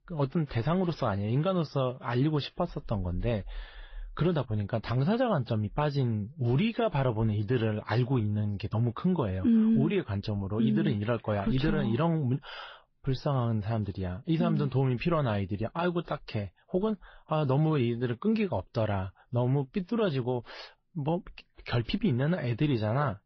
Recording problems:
garbled, watery; slightly; nothing above 5.5 kHz
high frequencies cut off; slight

